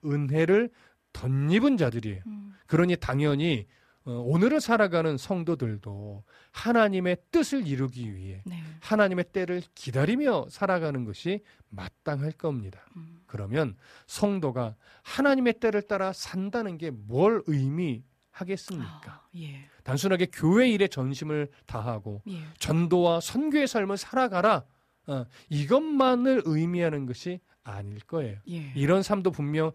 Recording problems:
none

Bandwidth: 14.5 kHz